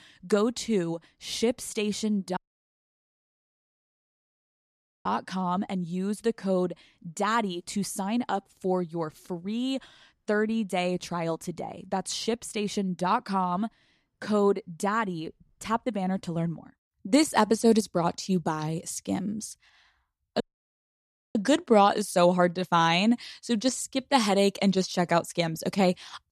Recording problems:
audio cutting out; at 2.5 s for 2.5 s and at 20 s for 1 s

